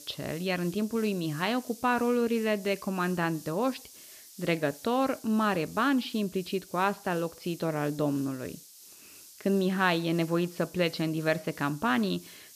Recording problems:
high frequencies cut off; noticeable; nothing above 5.5 kHz
hiss; noticeable; throughout; 20 dB below the speech

